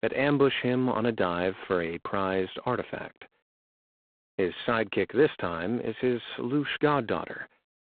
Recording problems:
phone-call audio; poor line; nothing above 3.5 kHz

